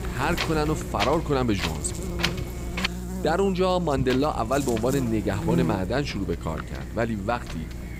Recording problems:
wind noise on the microphone; heavy; until 3 s and from 4 s on; 6 dB below the speech
electrical hum; noticeable; throughout; 60 Hz, 15 dB below the speech

